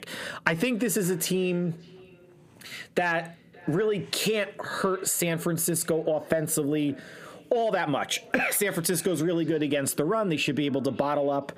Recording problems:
squashed, flat; heavily
echo of what is said; faint; throughout; 570 ms later, 25 dB below the speech

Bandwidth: 15 kHz